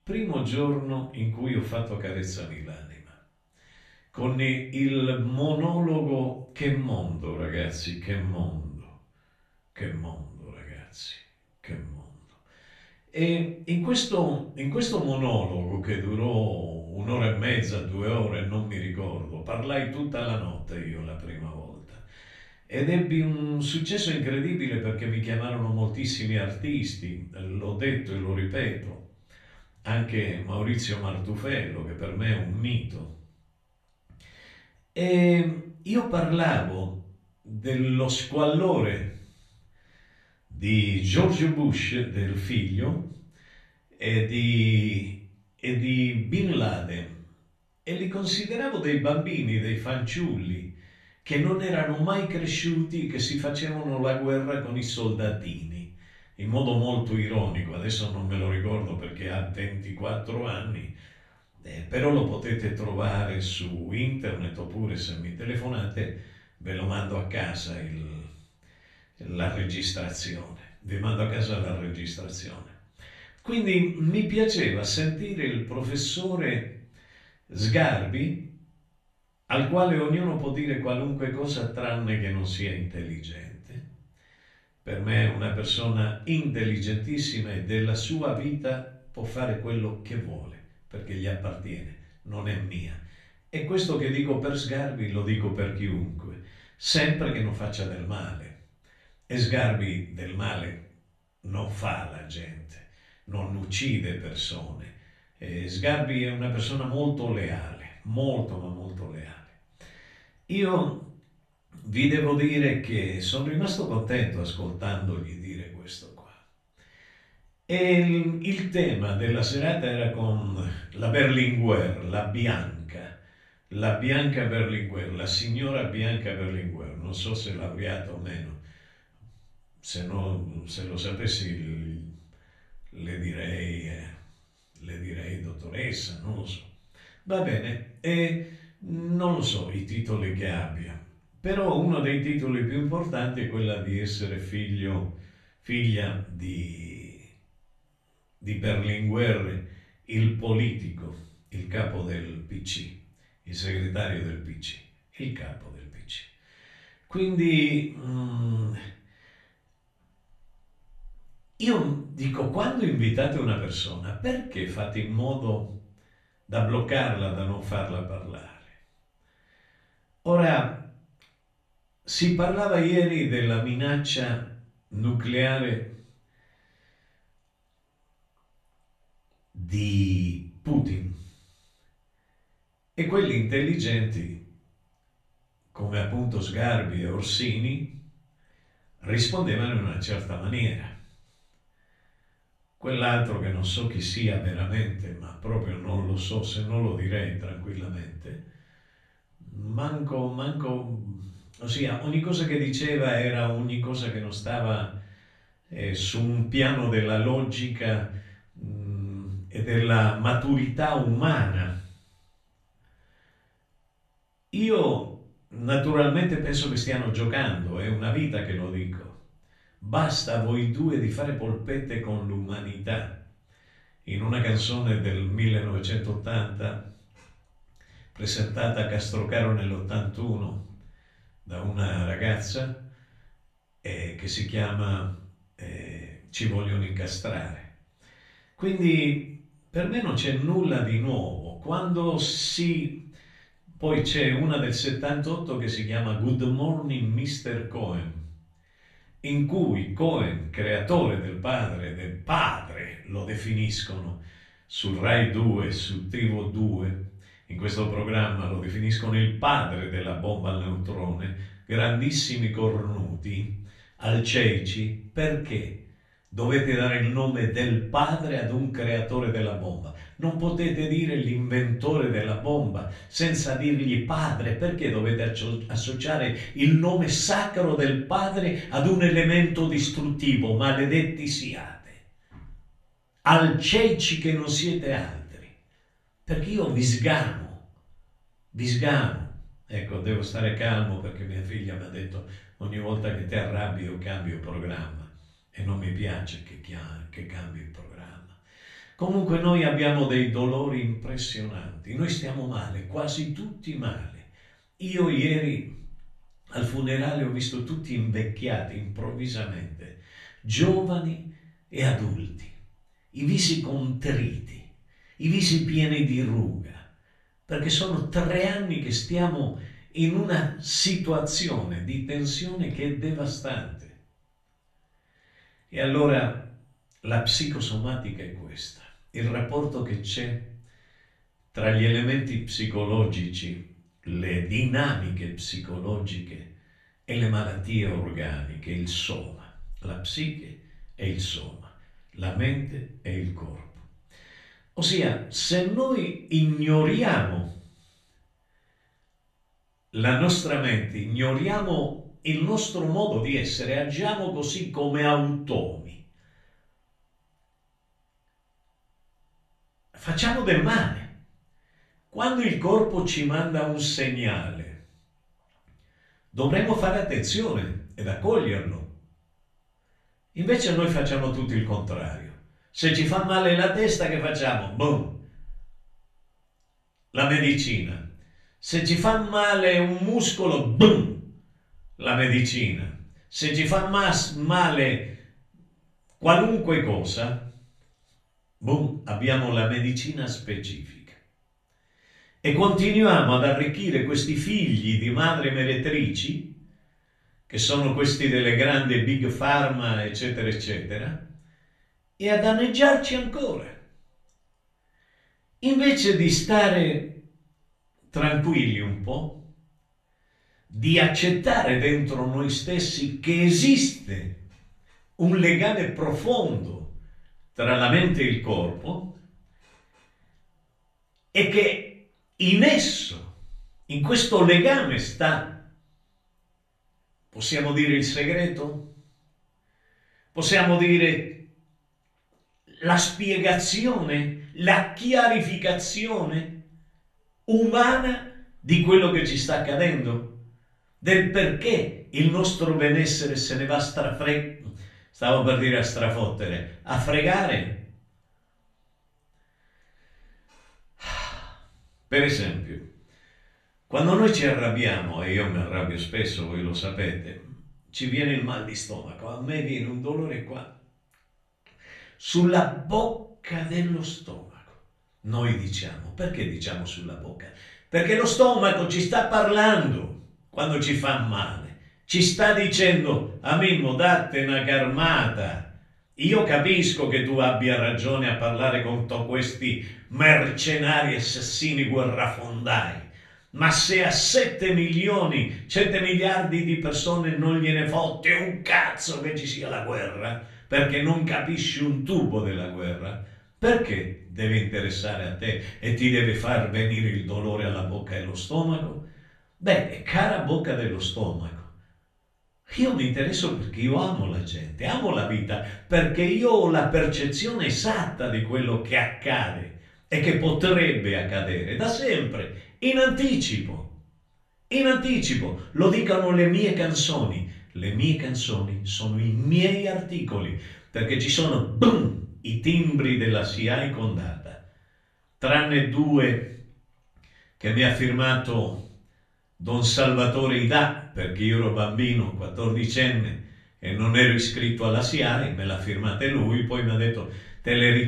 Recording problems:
off-mic speech; far
room echo; slight; dies away in 0.4 s

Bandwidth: 13.5 kHz